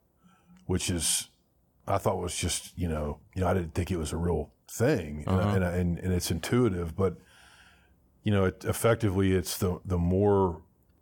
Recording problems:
none

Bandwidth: 18 kHz